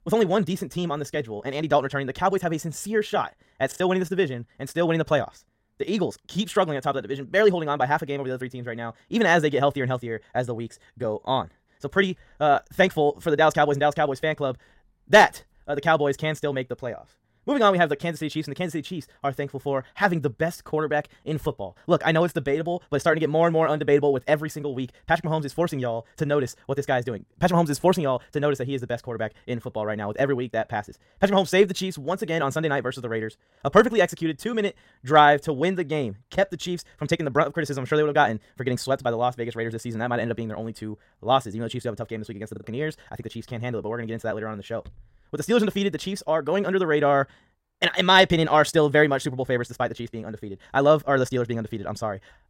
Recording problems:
wrong speed, natural pitch; too fast; 1.8 times normal speed
choppy; occasionally; at 3.5 s and at 43 s; 2% of the speech affected

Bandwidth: 16 kHz